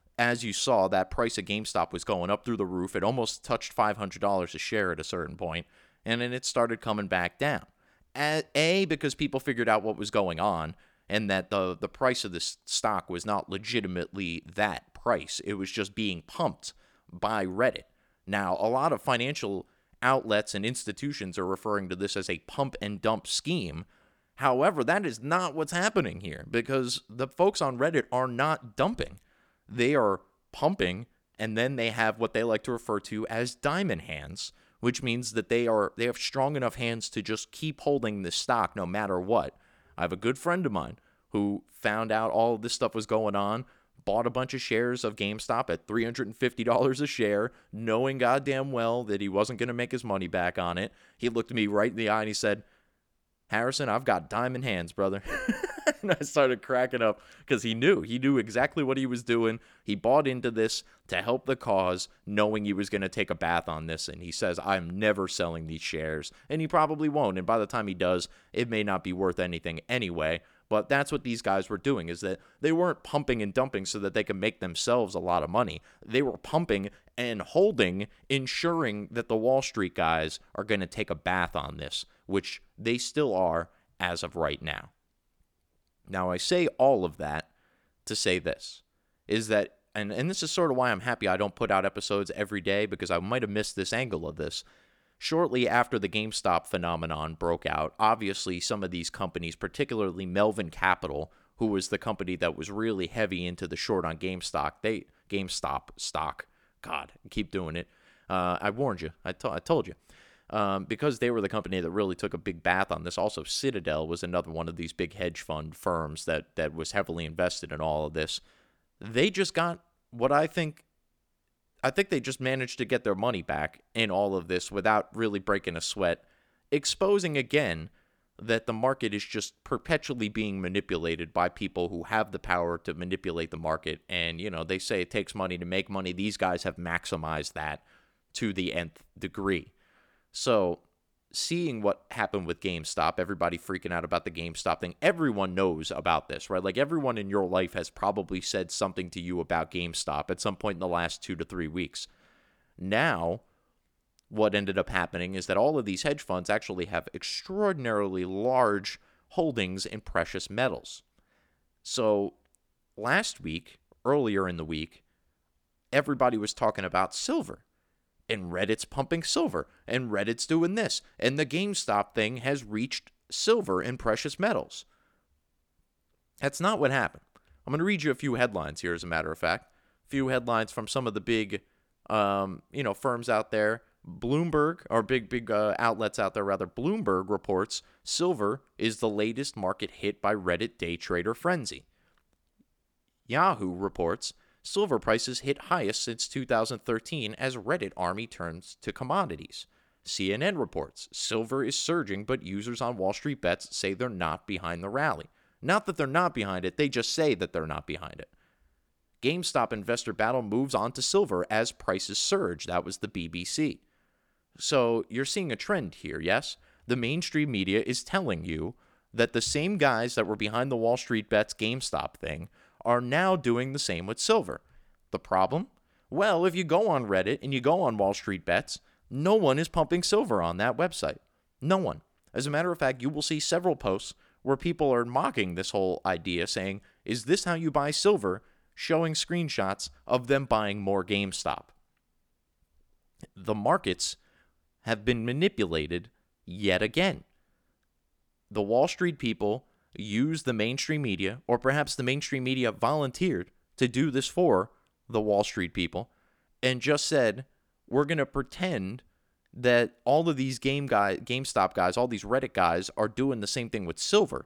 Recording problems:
none

